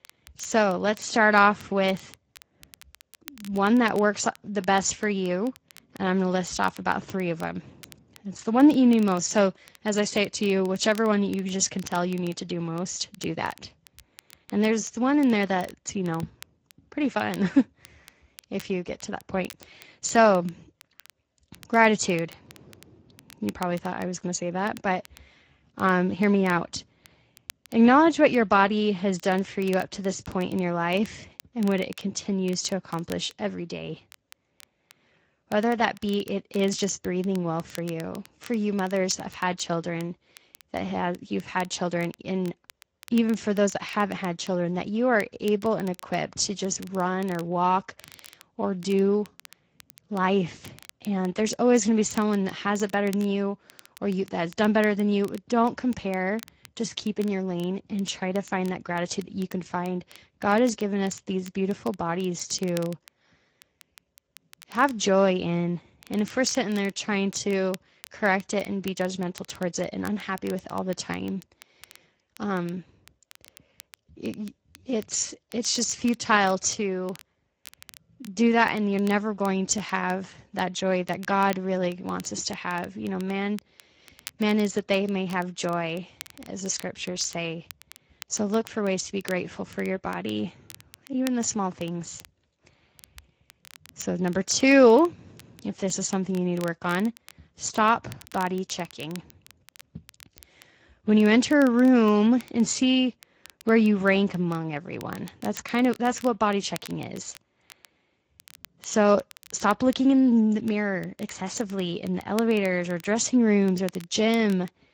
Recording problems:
garbled, watery; slightly; nothing above 7.5 kHz
crackle, like an old record; faint; 25 dB below the speech

